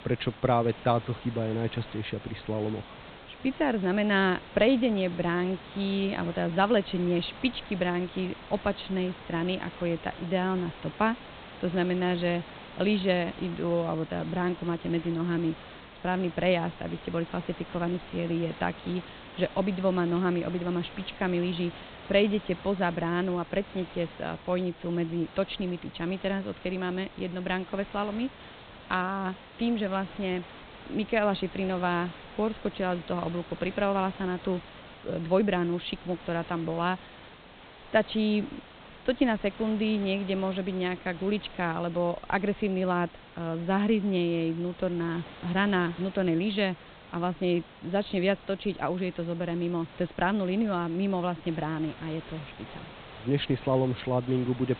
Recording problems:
high frequencies cut off; severe; nothing above 4 kHz
hiss; noticeable; throughout; 15 dB below the speech

